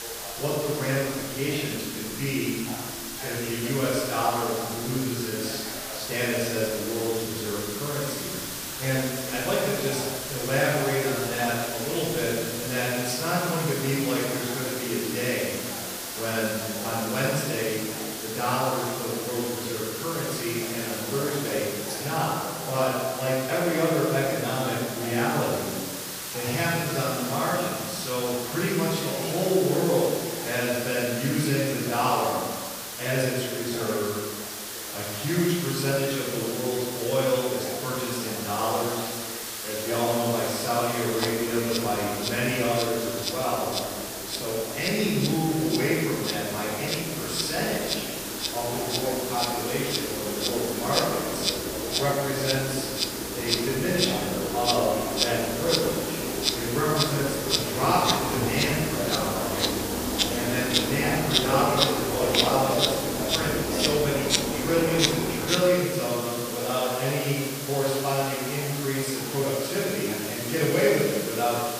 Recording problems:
off-mic speech; far
room echo; noticeable; dies away in 1.5 s
animal sounds; loud; throughout; 1 dB below the speech
hiss; loud; throughout; 5 dB below the speech
voice in the background; noticeable; throughout; 15 dB below the speech

